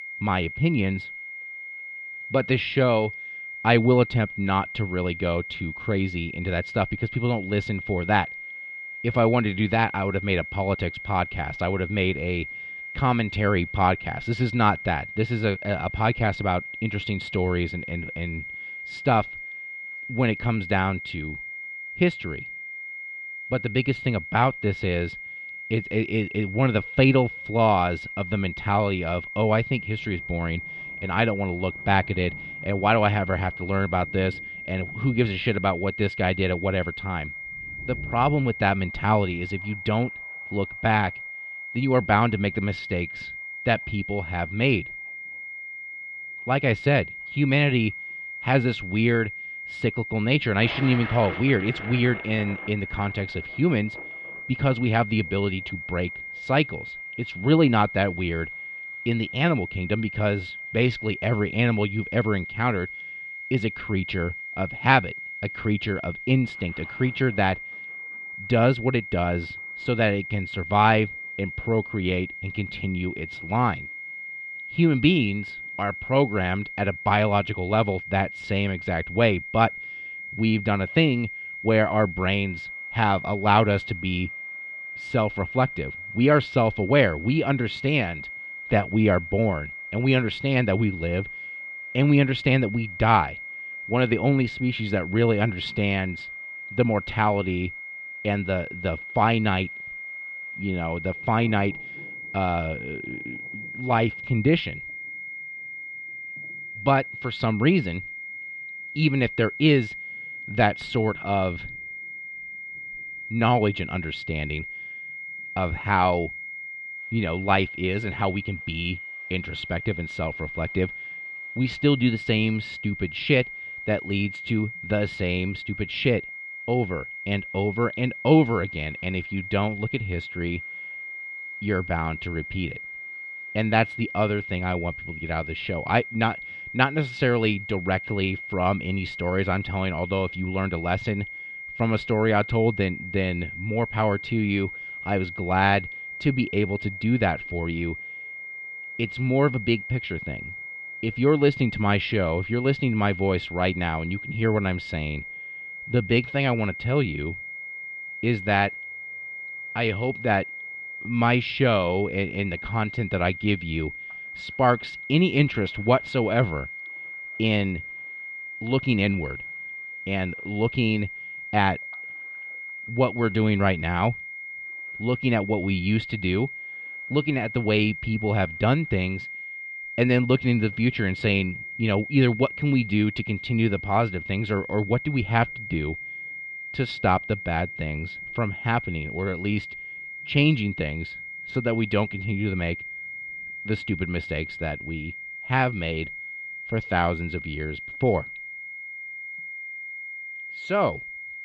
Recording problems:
muffled; slightly; fading above 3.5 kHz
high-pitched whine; loud; throughout; 2 kHz, 10 dB below the speech
rain or running water; faint; throughout; 25 dB below the speech

